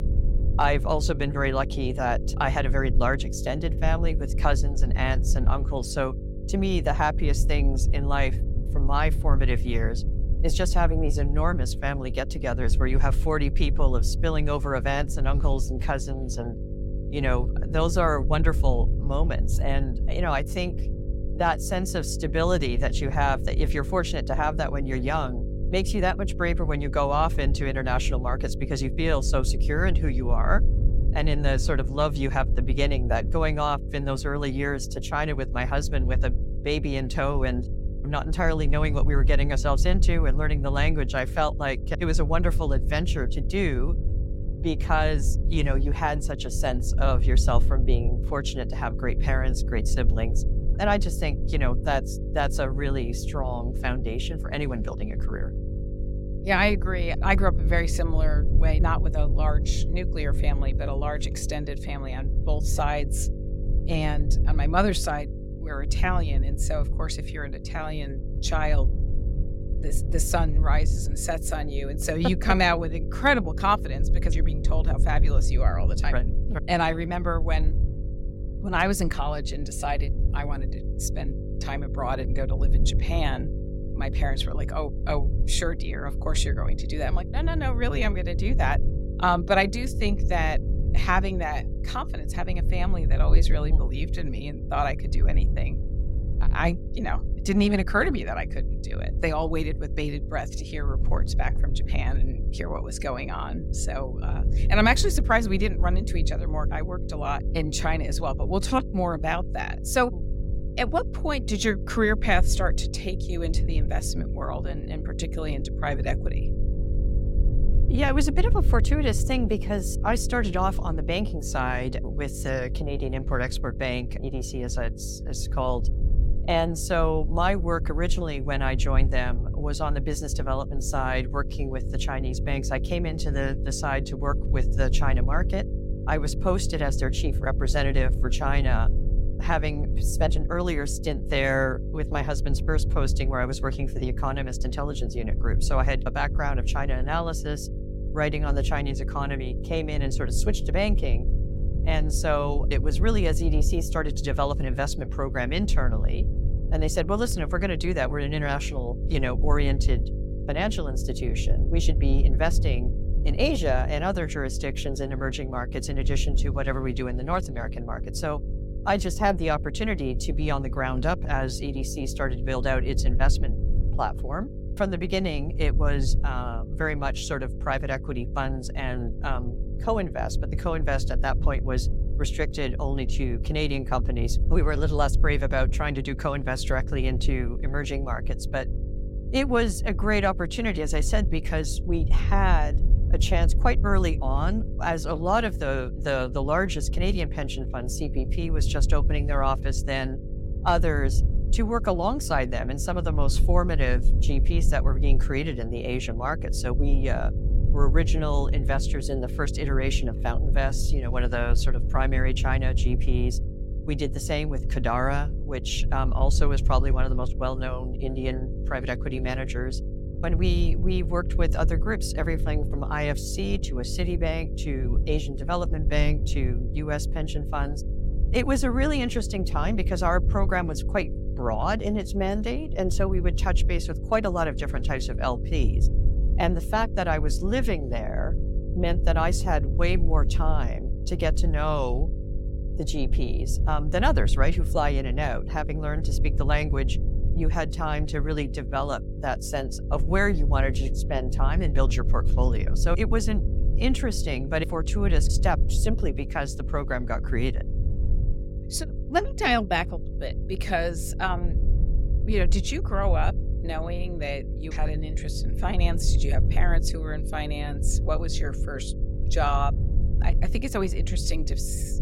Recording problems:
electrical hum; noticeable; throughout; 50 Hz, 15 dB below the speech
low rumble; noticeable; throughout; 20 dB below the speech

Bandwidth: 16 kHz